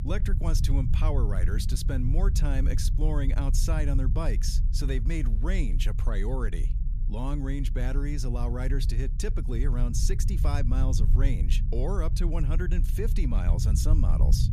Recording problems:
low rumble; loud; throughout; 8 dB below the speech

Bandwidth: 14.5 kHz